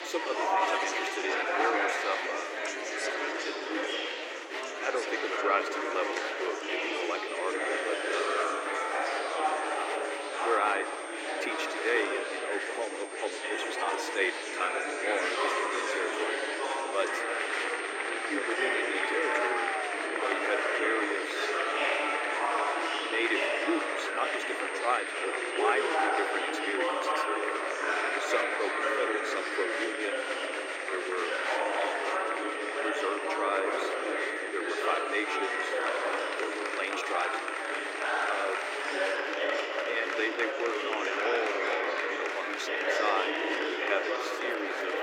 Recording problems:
thin; very; fading below 300 Hz
murmuring crowd; very loud; throughout; 4 dB above the speech
high-pitched whine; noticeable; from 7.5 to 39 s; 8.5 kHz, 15 dB below the speech
household noises; faint; throughout; 25 dB below the speech

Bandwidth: 16.5 kHz